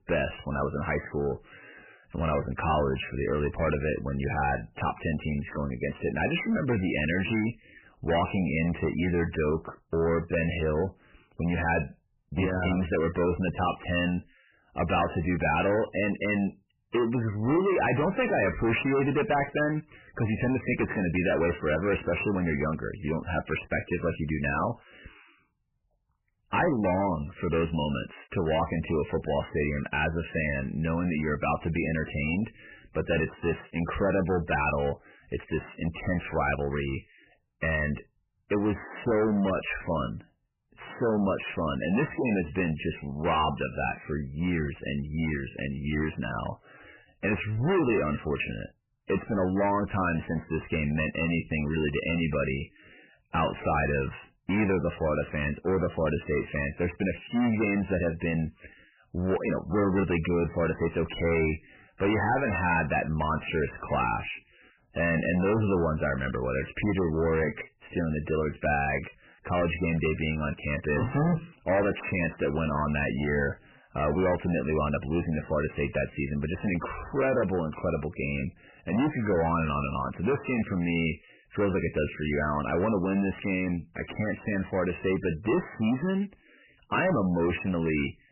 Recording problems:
distortion; heavy; 15% of the sound clipped
garbled, watery; badly; nothing above 3 kHz

